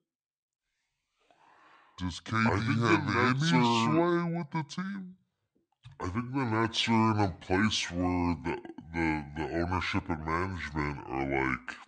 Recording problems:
wrong speed and pitch; too slow and too low; 0.7 times normal speed

